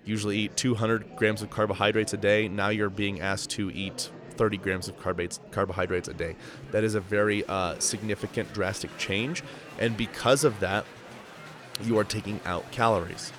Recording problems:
murmuring crowd; noticeable; throughout; 15 dB below the speech

